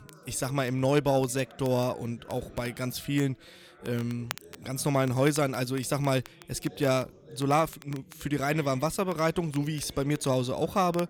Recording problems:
background chatter; faint; throughout; 4 voices, 25 dB below the speech
crackle, like an old record; faint; 20 dB below the speech

